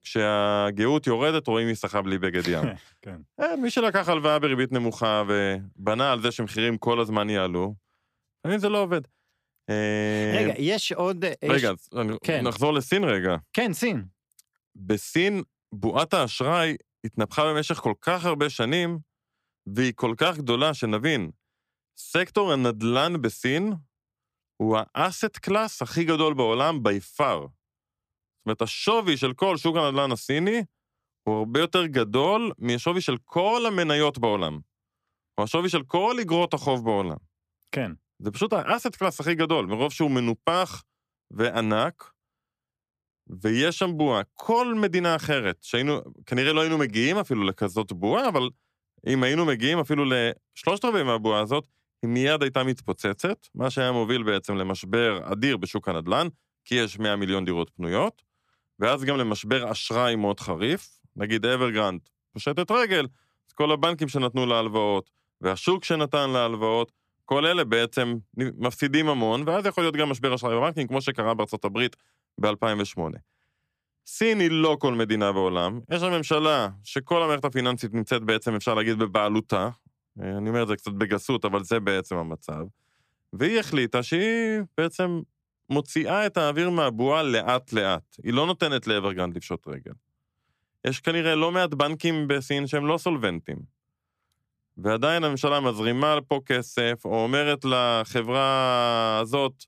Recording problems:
none

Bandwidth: 14.5 kHz